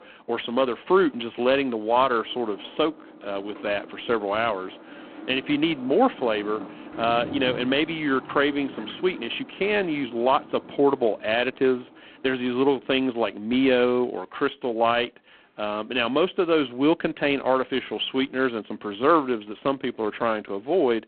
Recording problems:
phone-call audio; poor line
traffic noise; noticeable; throughout; 20 dB below the speech

